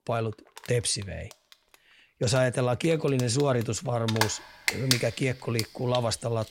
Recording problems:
household noises; loud; throughout; 4 dB below the speech

